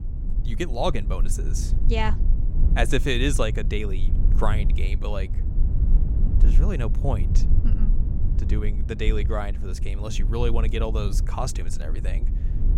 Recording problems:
low rumble; noticeable; throughout; 10 dB below the speech

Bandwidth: 16 kHz